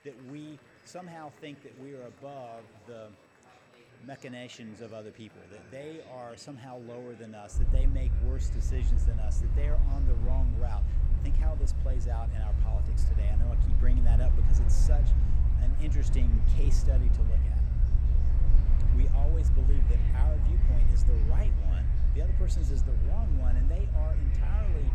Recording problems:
low rumble; loud; from 7.5 s on; 2 dB below the speech
murmuring crowd; noticeable; throughout; 10 dB below the speech
high-pitched whine; faint; throughout; 2.5 kHz, 25 dB below the speech

